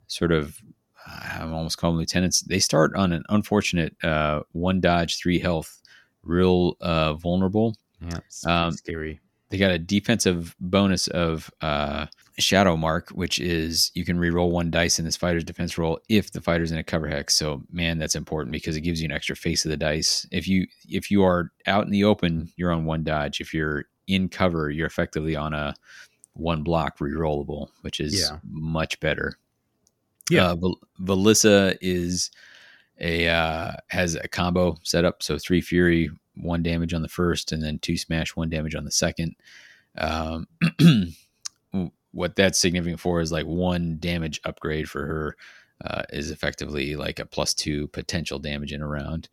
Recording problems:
none

